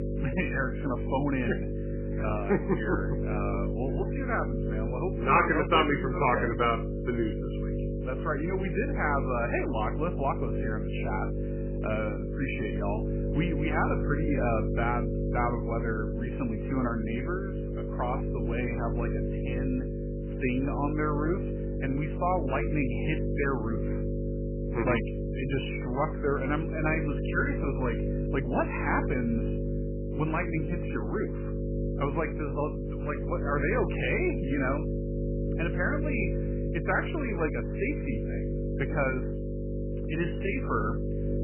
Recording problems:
garbled, watery; badly; nothing above 3 kHz
electrical hum; loud; throughout; 50 Hz, 6 dB below the speech

